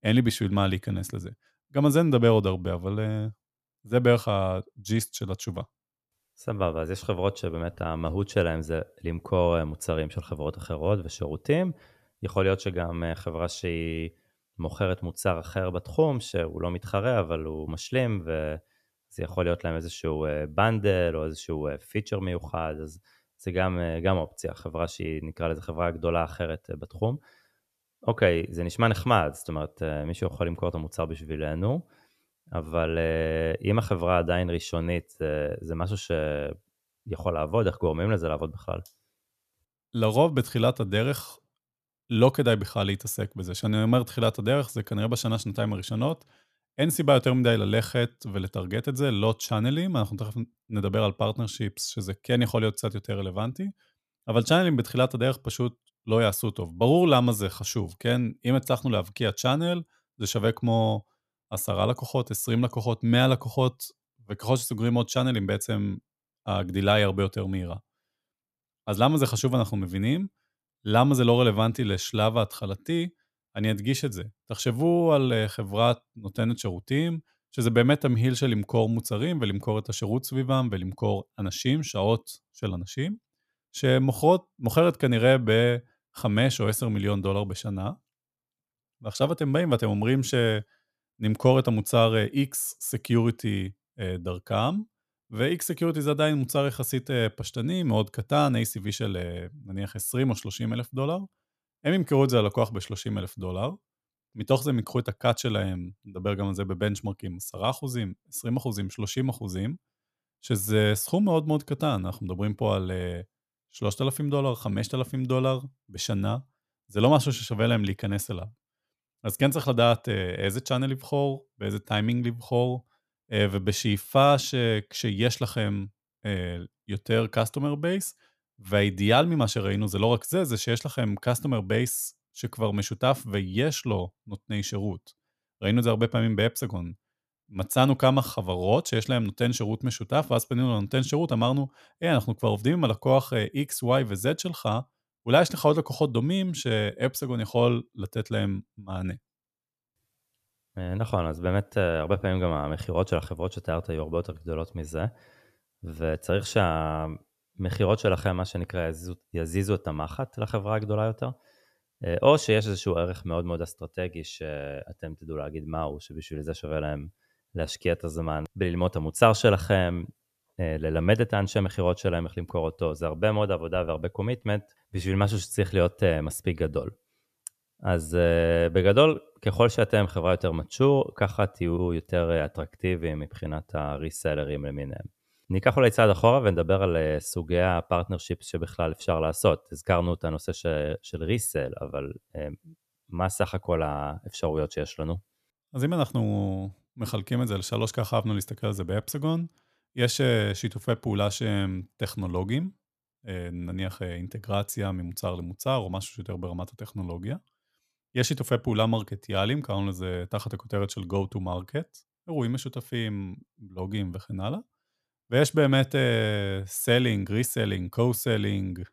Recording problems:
none

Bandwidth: 14.5 kHz